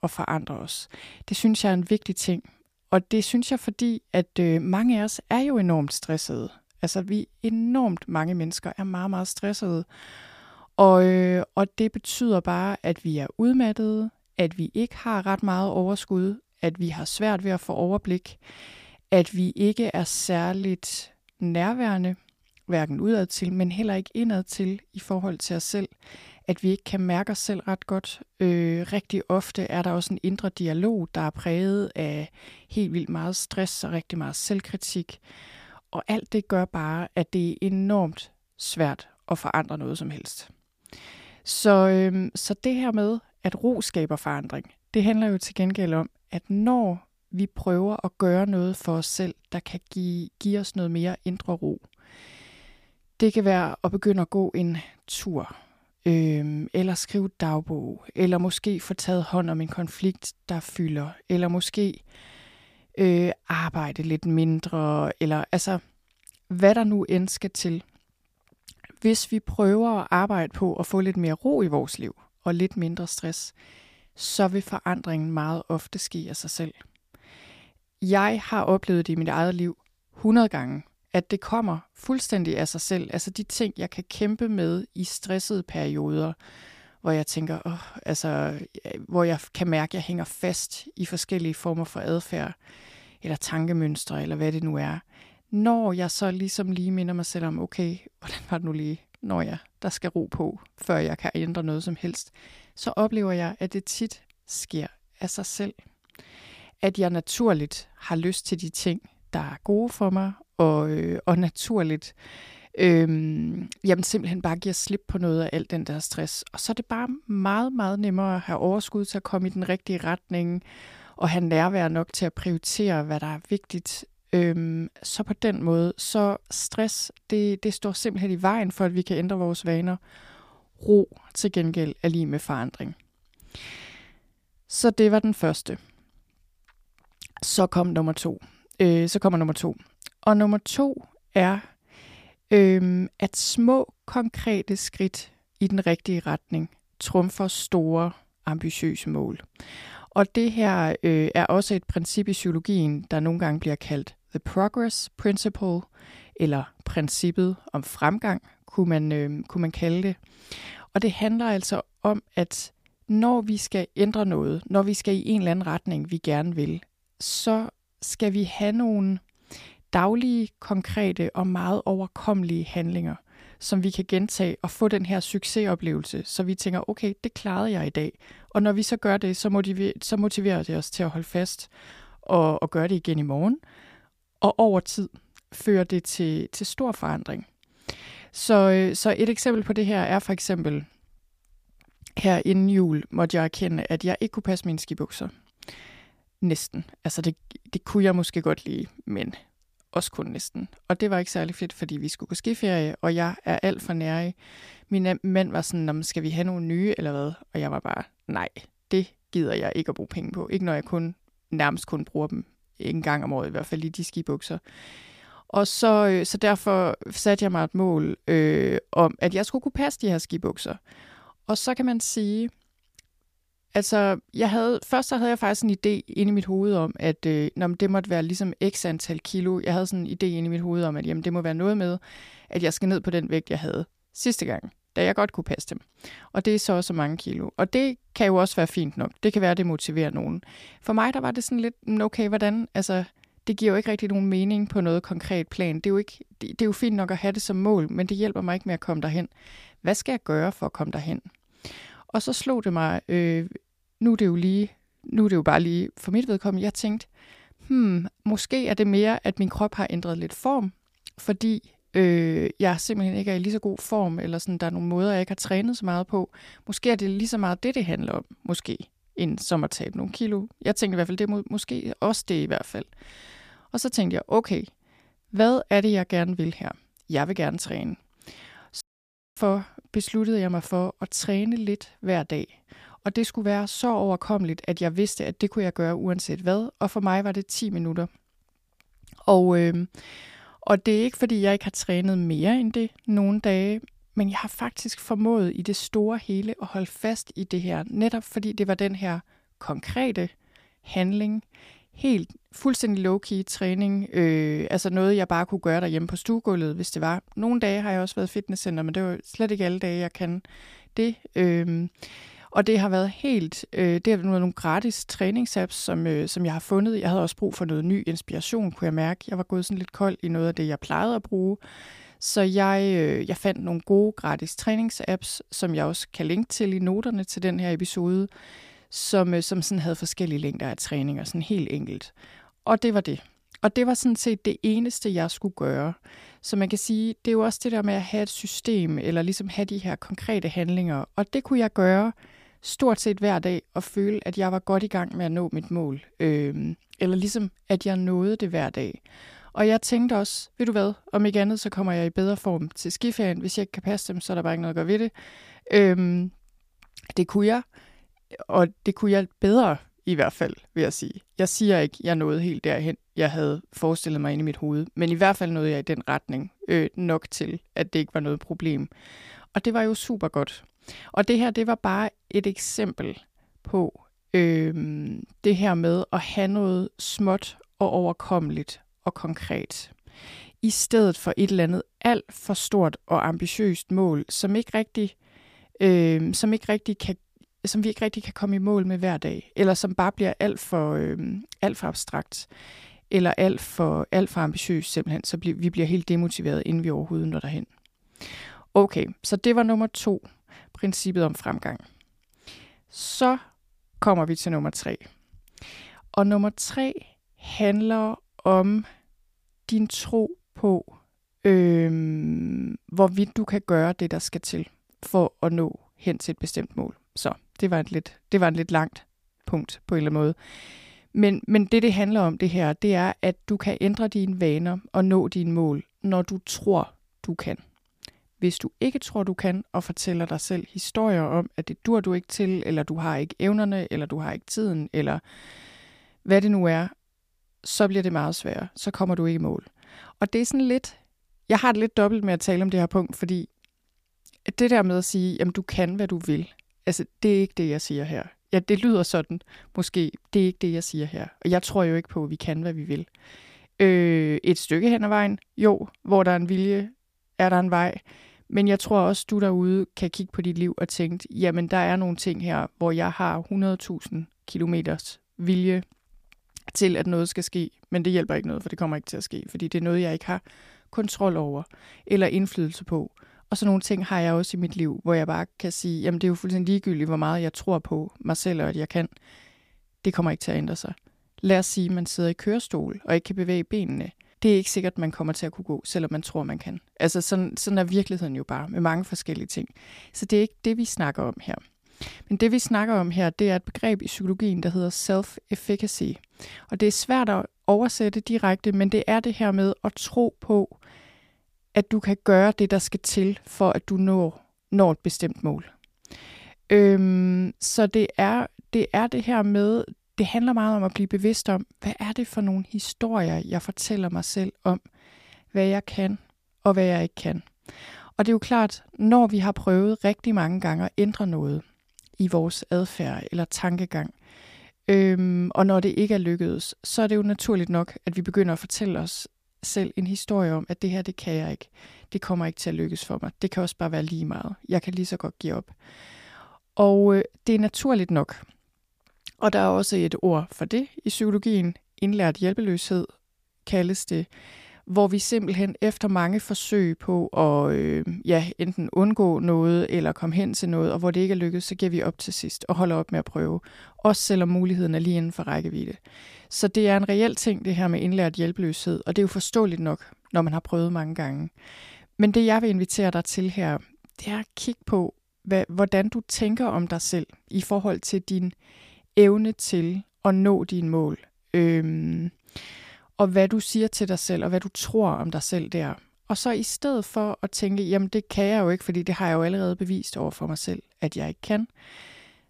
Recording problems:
audio cutting out; at 4:39 for 0.5 s

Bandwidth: 15 kHz